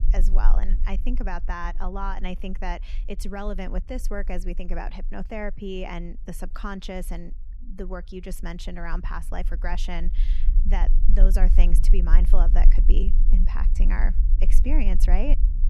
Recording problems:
low rumble; noticeable; throughout; 15 dB below the speech

